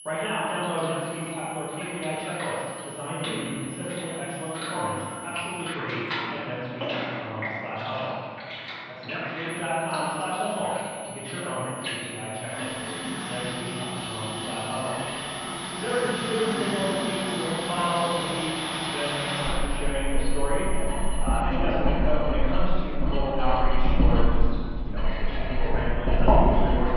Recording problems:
room echo; strong; dies away in 2 s
off-mic speech; far
muffled; very; fading above 4 kHz
household noises; very loud; throughout; 1 dB above the speech
high-pitched whine; loud; until 5.5 s and from 9.5 to 21 s; 10.5 kHz, 9 dB below the speech

